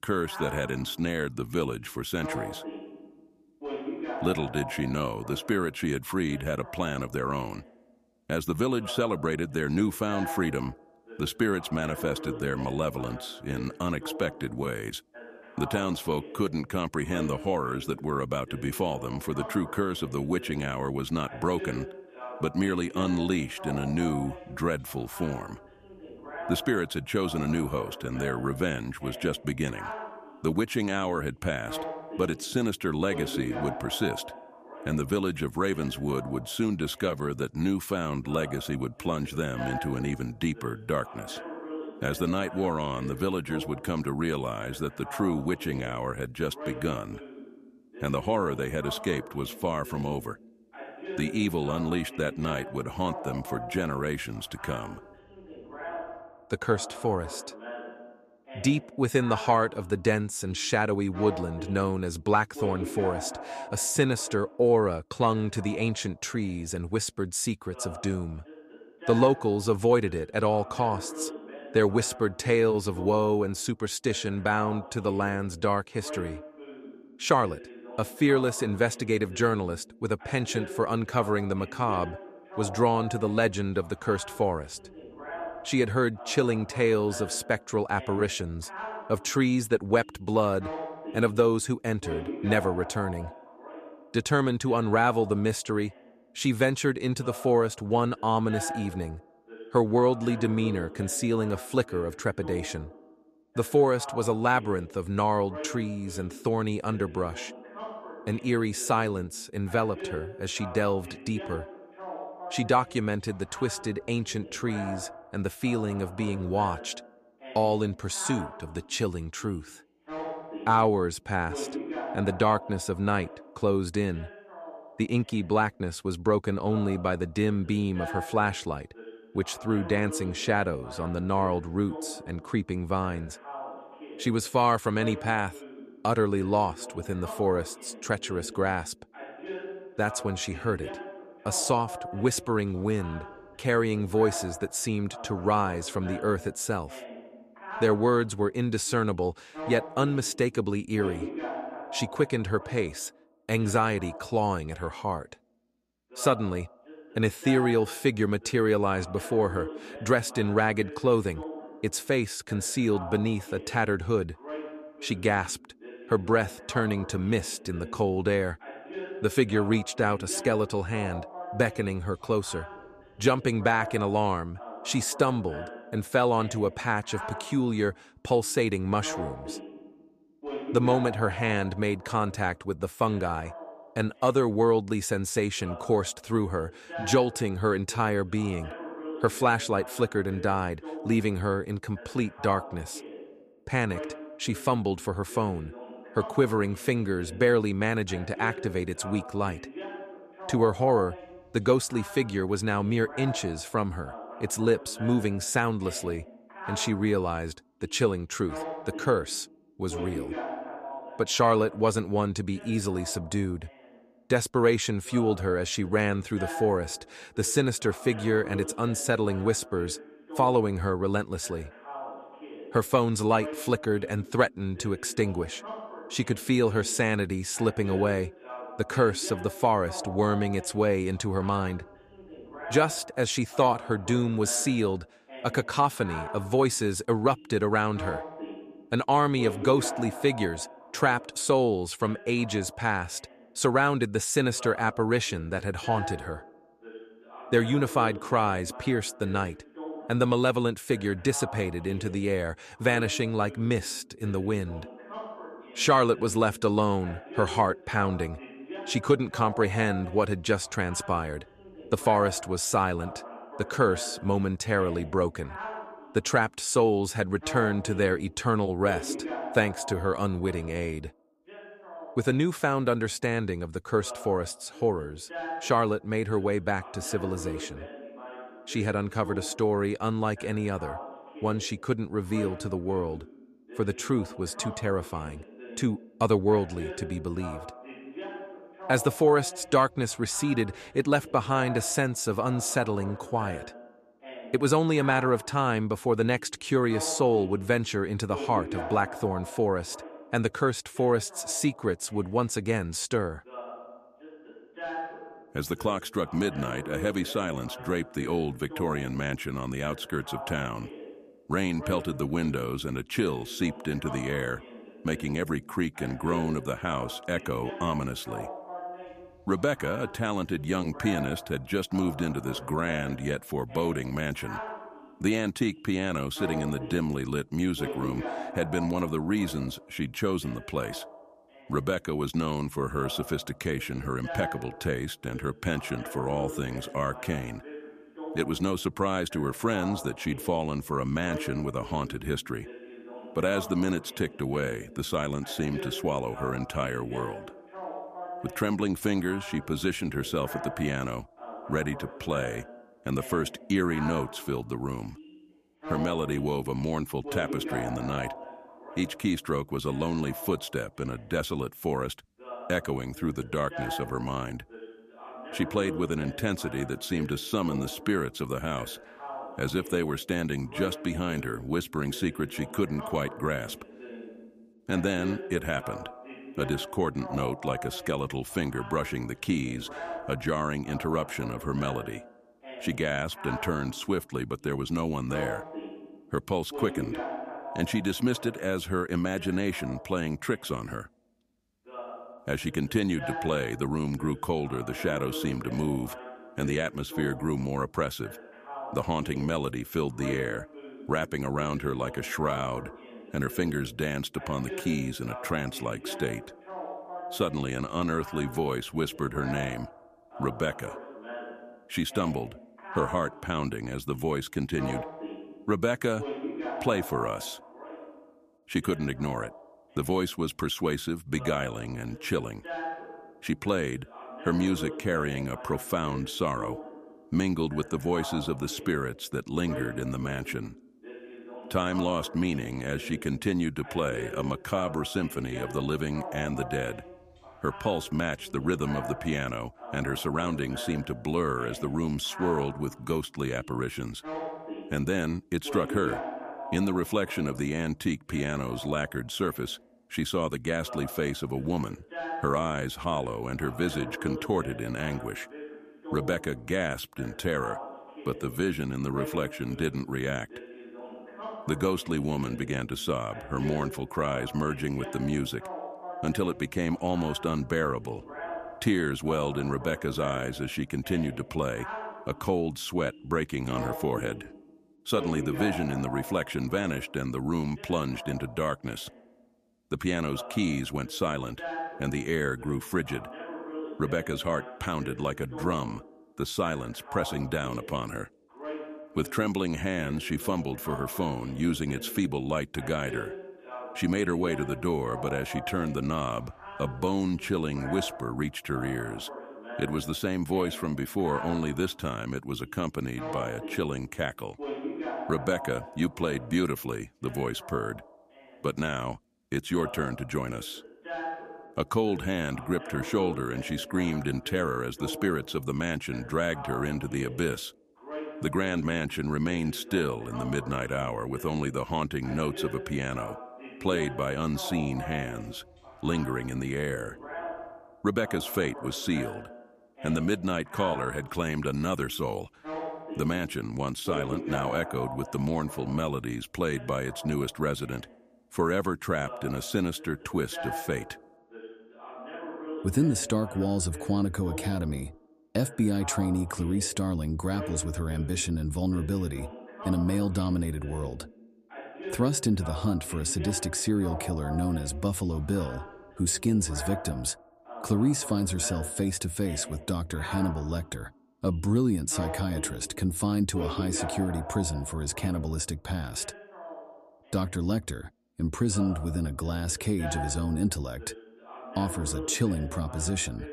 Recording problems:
voice in the background; noticeable; throughout; 15 dB below the speech

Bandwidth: 14.5 kHz